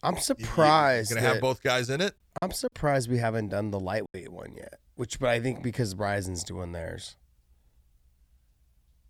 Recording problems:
choppy; occasionally; from 2.5 to 4 s; 5% of the speech affected

